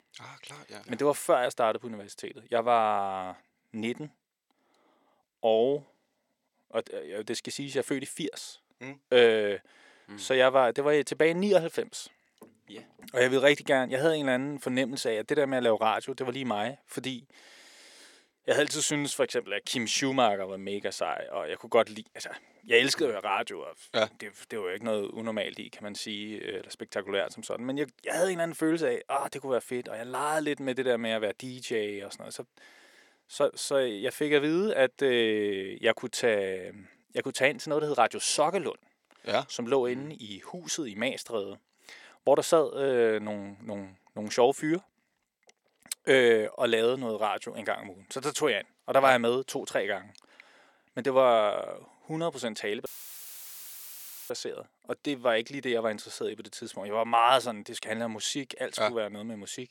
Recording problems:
thin; somewhat; fading below 400 Hz
audio cutting out; filled with static; at 53 s for 1.5 s

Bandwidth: 17.5 kHz